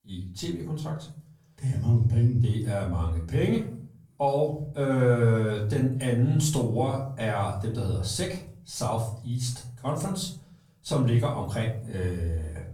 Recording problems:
off-mic speech; far
room echo; slight; dies away in 0.5 s

